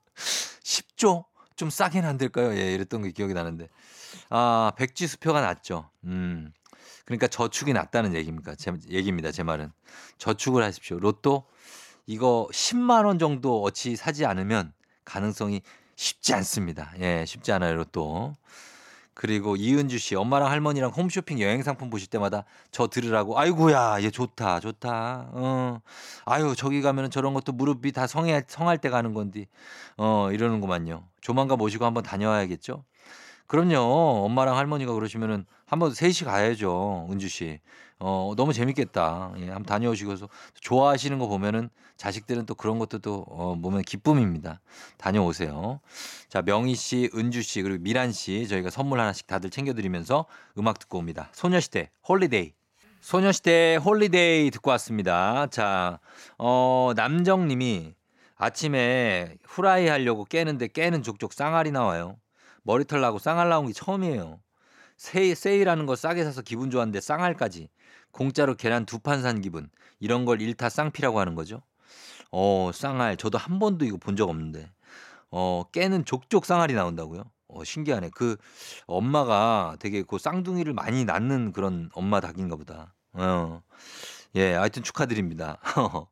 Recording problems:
none

